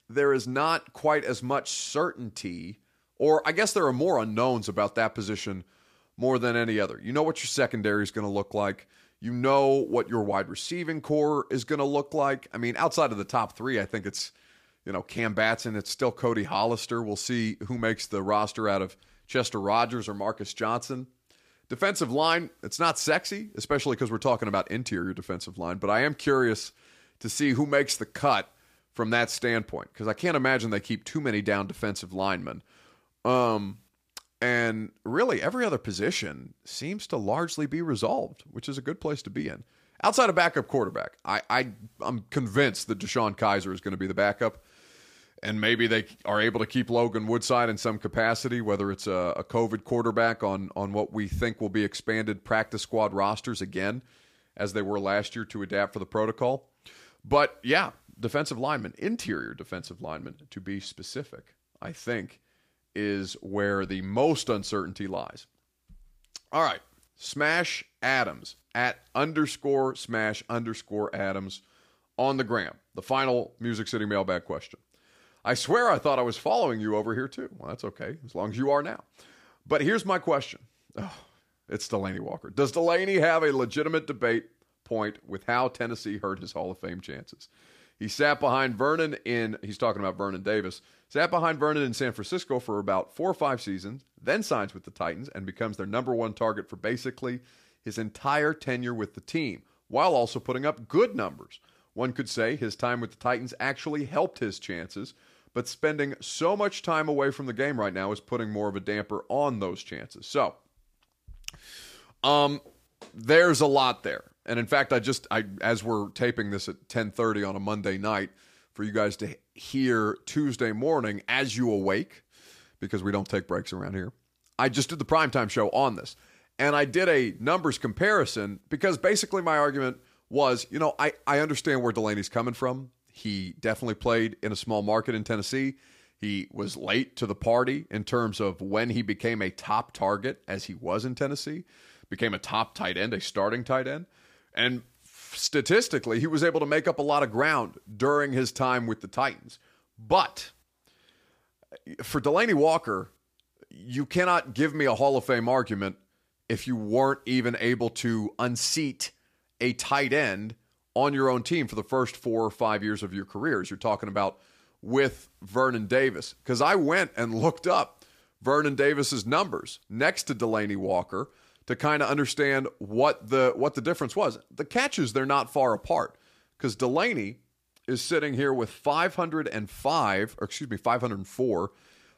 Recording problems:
none

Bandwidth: 15 kHz